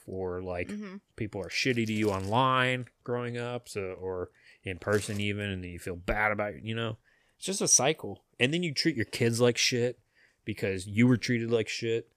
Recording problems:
none

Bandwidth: 14.5 kHz